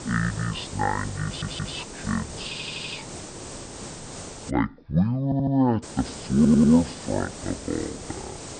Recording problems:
wrong speed and pitch; too slow and too low; 0.5 times normal speed
high frequencies cut off; noticeable; nothing above 5.5 kHz
hiss; noticeable; until 4.5 s and from 6 s on; 10 dB below the speech
audio stuttering; 4 times, first at 1.5 s

